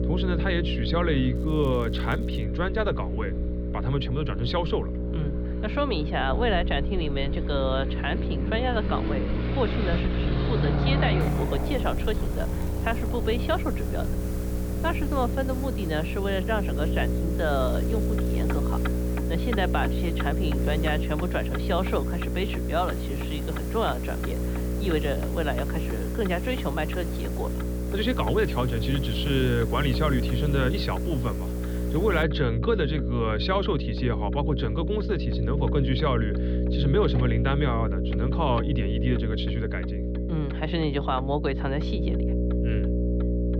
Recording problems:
muffled; very slightly; fading above 4 kHz
electrical hum; loud; throughout; 60 Hz, 7 dB below the speech
traffic noise; loud; throughout; 8 dB below the speech
hiss; noticeable; from 11 to 32 s; 15 dB below the speech
crackling; faint; from 1.5 to 2.5 s, from 12 to 13 s and from 18 to 19 s; 25 dB below the speech

